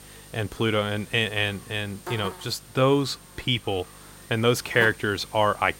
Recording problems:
electrical hum; noticeable; throughout; 50 Hz, 15 dB below the speech

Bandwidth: 16 kHz